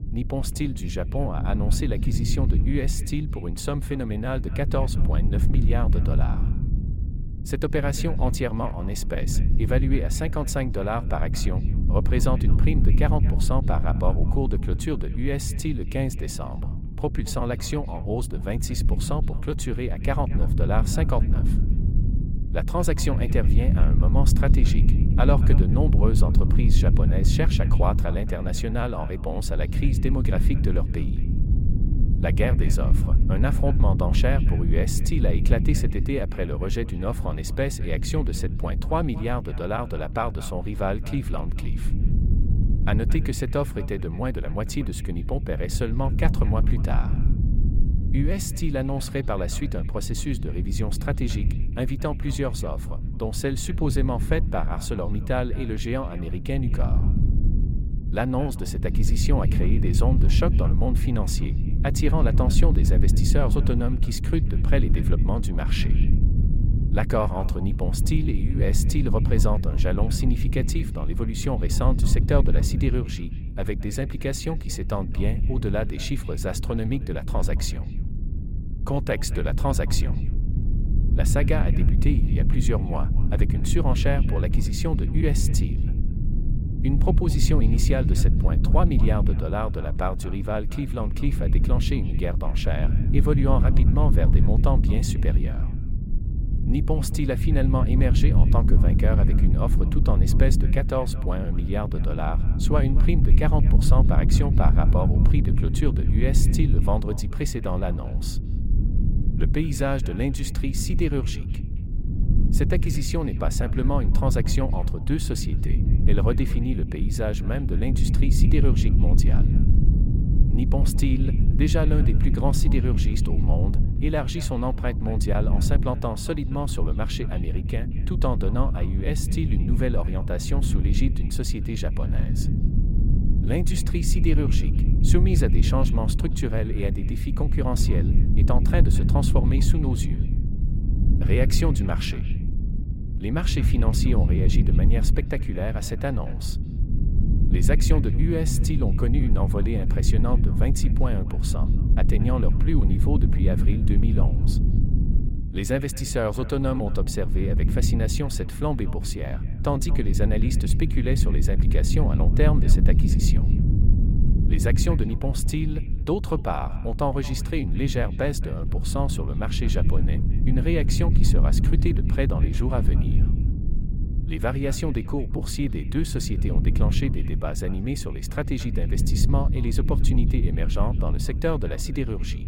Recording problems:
echo of what is said; faint; throughout; 220 ms later, 25 dB below the speech
low rumble; loud; throughout; 7 dB below the speech

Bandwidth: 16.5 kHz